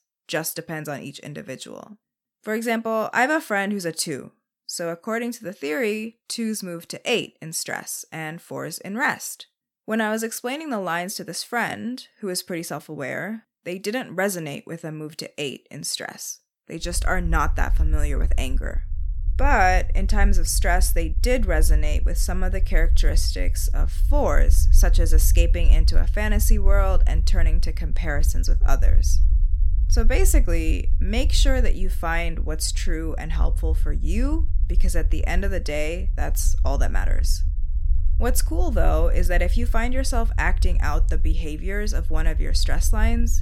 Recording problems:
low rumble; noticeable; from 17 s on; 20 dB below the speech

